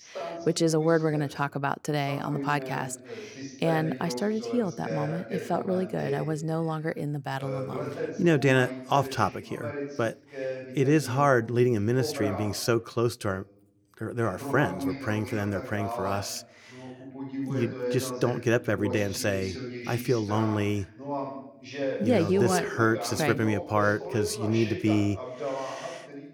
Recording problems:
voice in the background; loud; throughout; 9 dB below the speech

